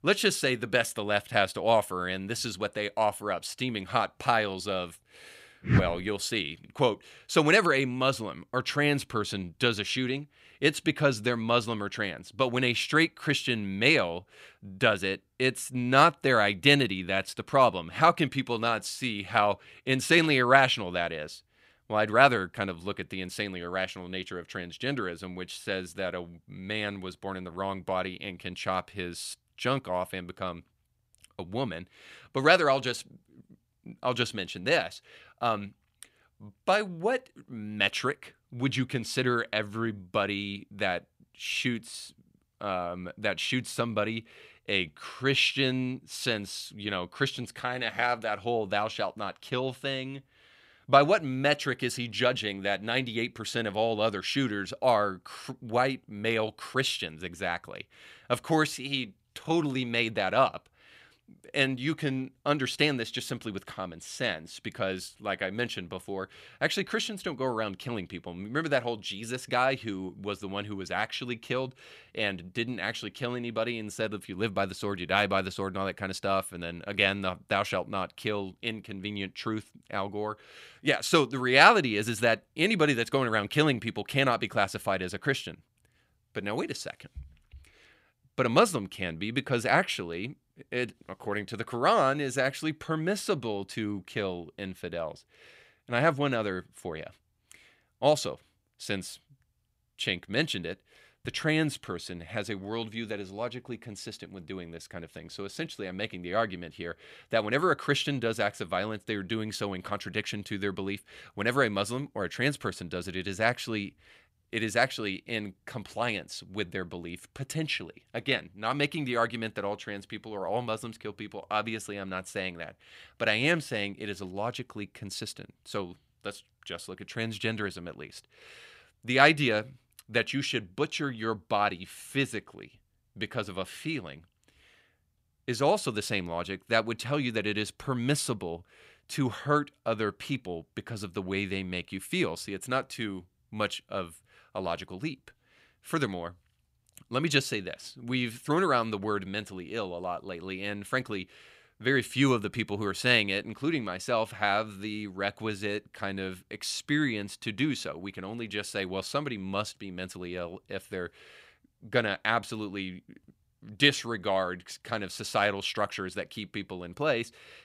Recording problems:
none

